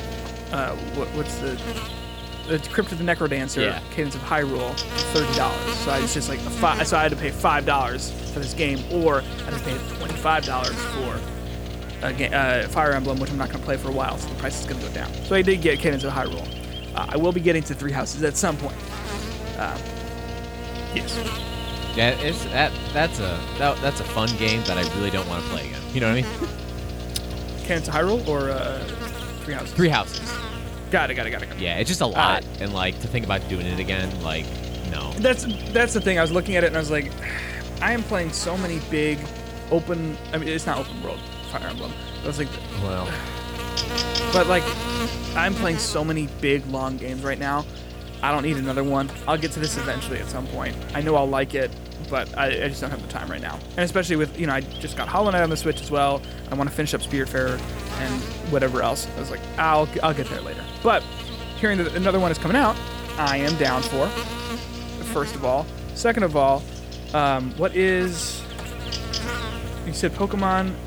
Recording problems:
electrical hum; loud; throughout; 60 Hz, 9 dB below the speech

